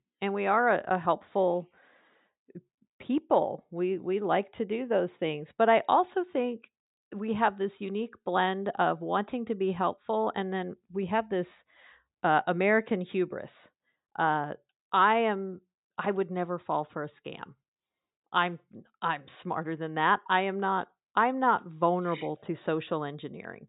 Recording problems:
high frequencies cut off; severe; nothing above 4 kHz

